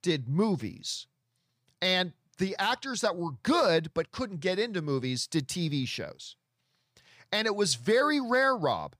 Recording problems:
none

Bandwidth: 15 kHz